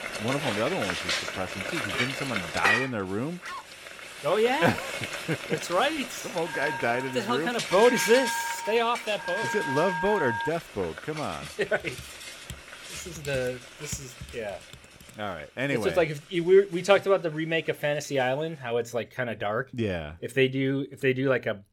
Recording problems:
household noises; loud; throughout; 5 dB below the speech
dog barking; faint; at 3.5 s; peak 10 dB below the speech
phone ringing; noticeable; from 6.5 to 10 s; peak 2 dB below the speech
keyboard typing; faint; from 12 to 15 s; peak 15 dB below the speech

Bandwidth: 17 kHz